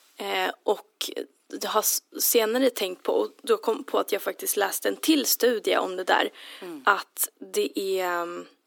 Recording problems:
thin; somewhat; fading below 300 Hz

